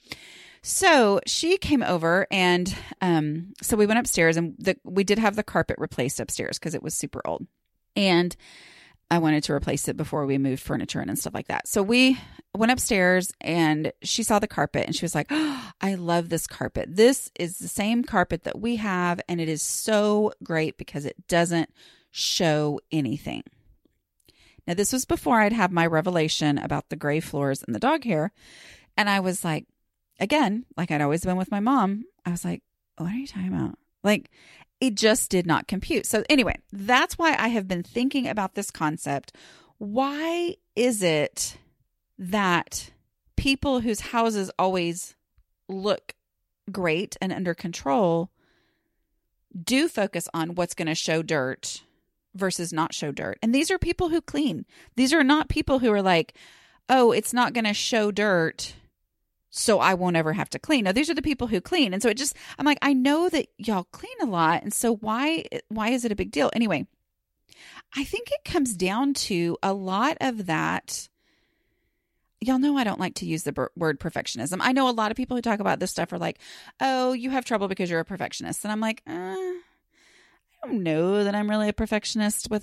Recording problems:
none

